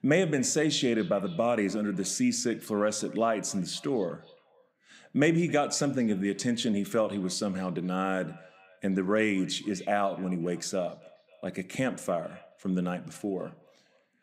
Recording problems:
echo of what is said; faint; throughout; 270 ms later, 25 dB below the speech

